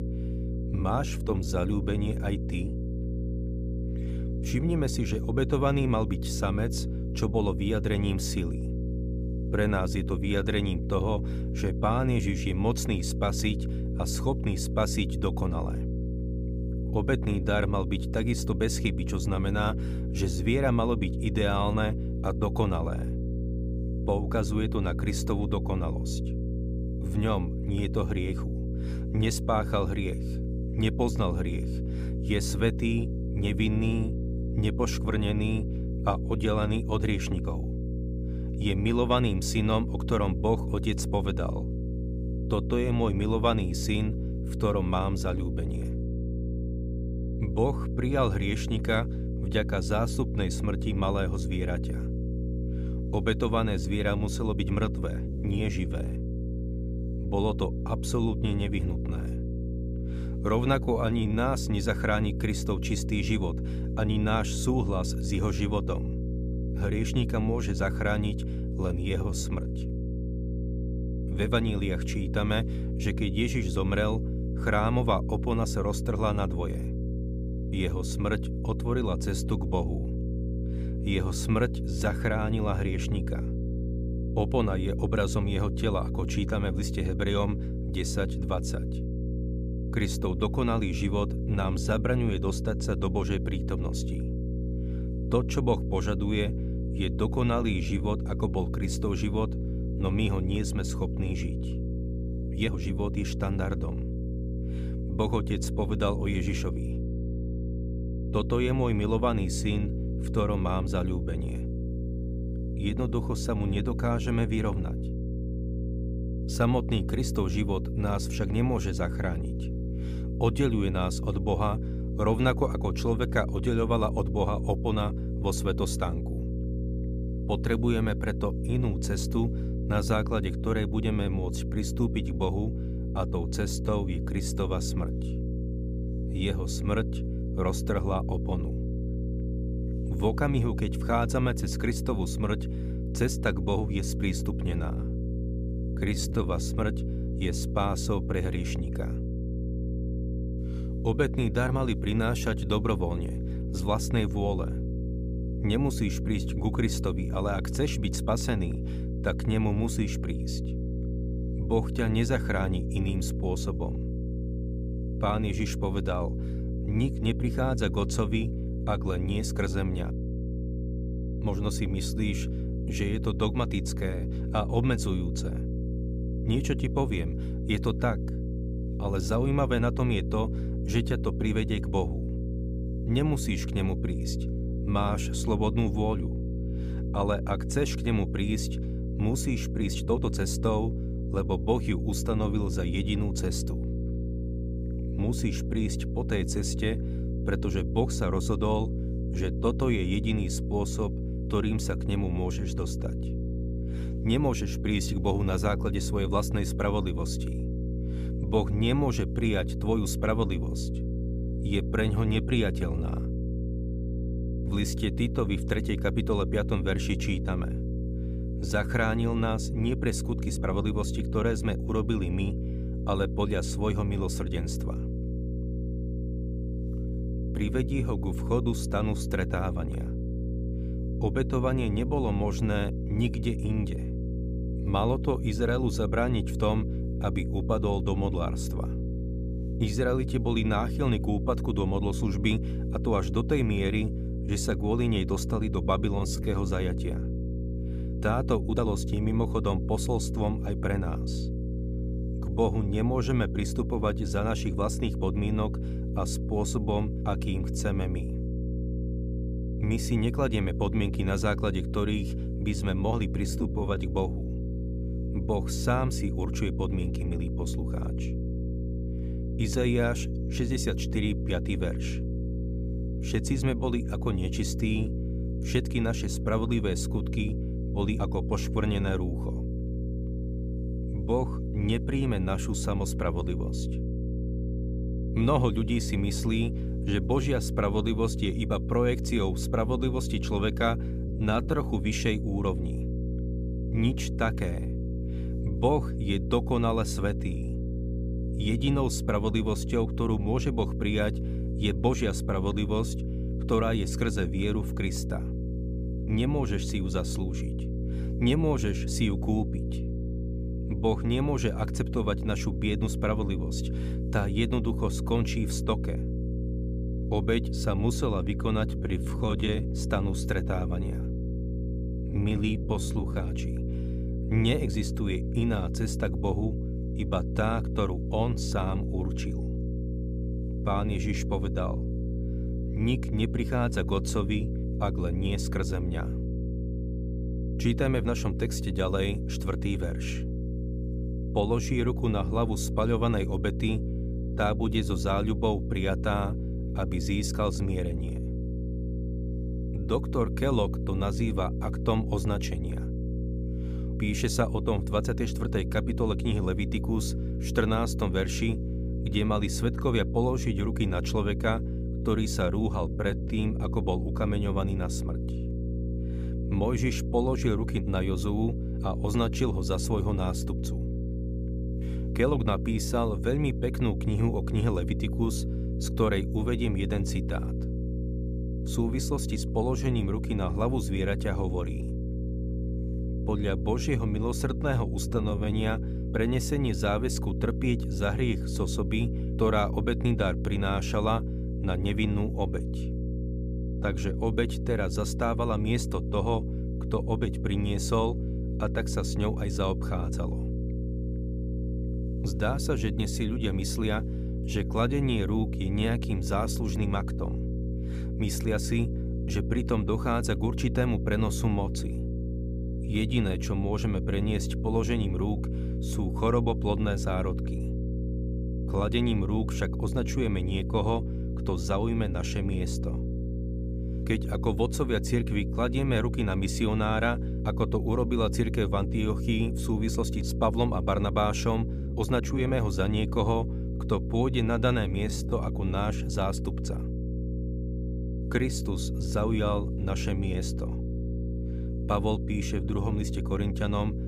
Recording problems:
electrical hum; loud; throughout; 60 Hz, 9 dB below the speech
uneven, jittery; strongly; from 0.5 s to 7:16

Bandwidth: 15 kHz